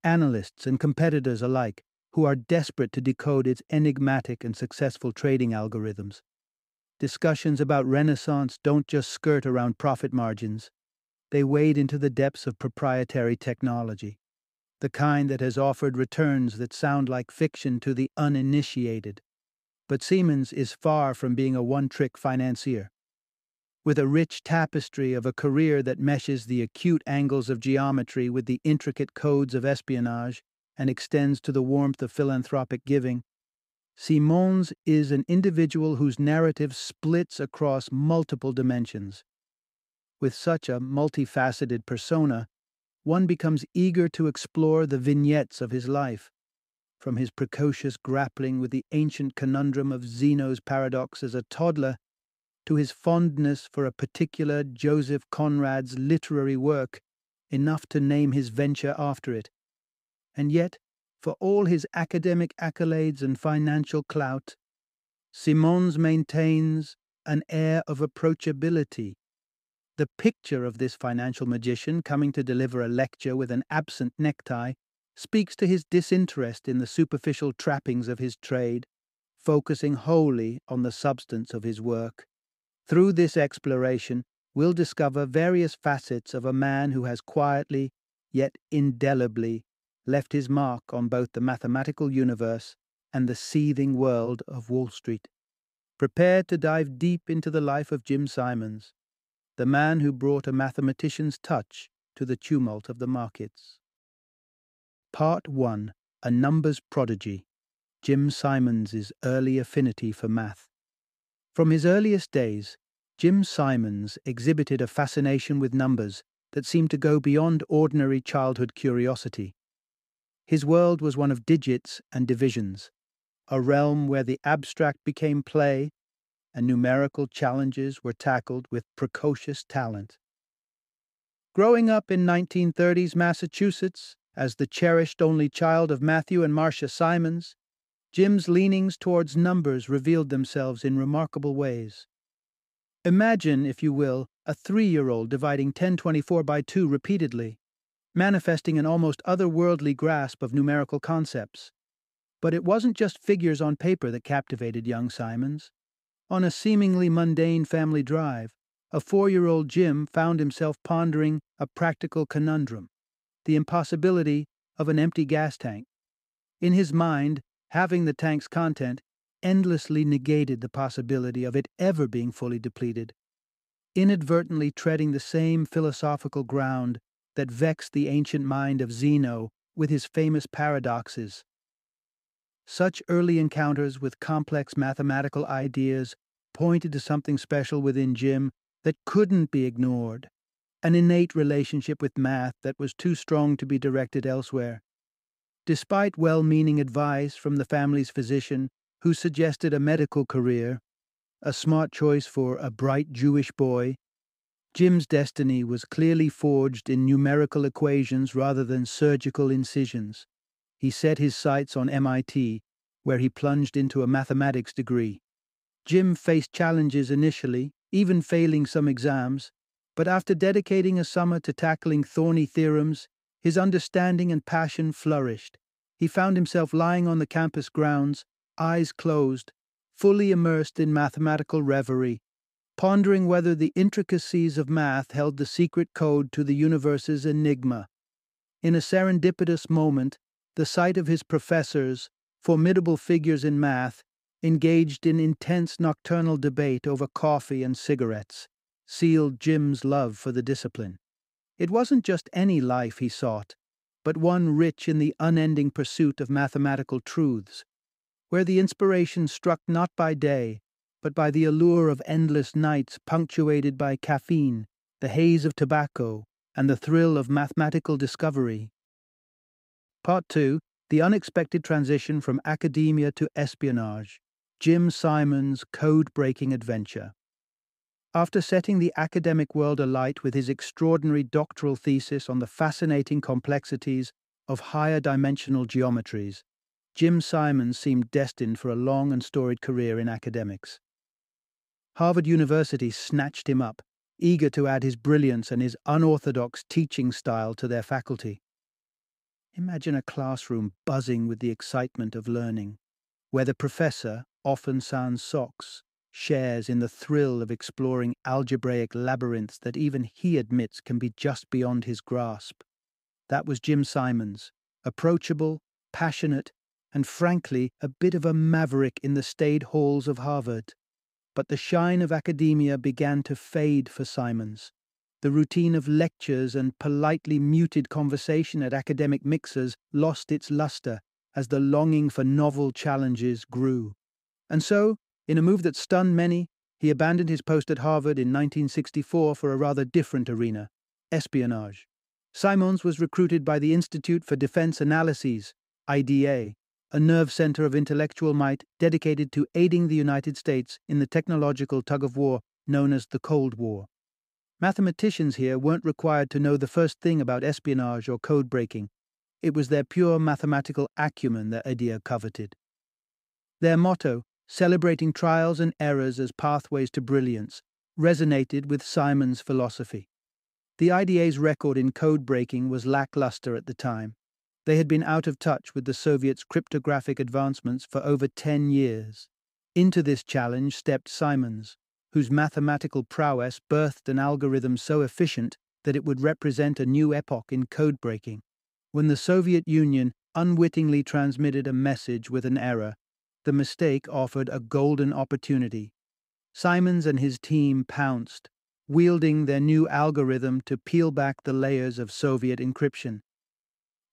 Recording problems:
none

